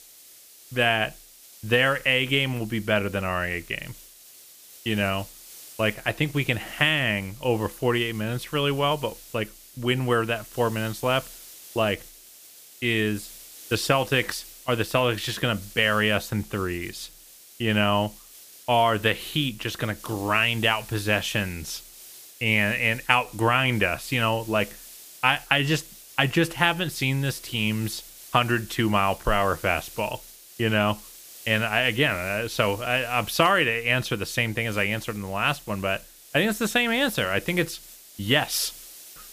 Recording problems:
hiss; noticeable; throughout; 20 dB below the speech

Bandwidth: 15 kHz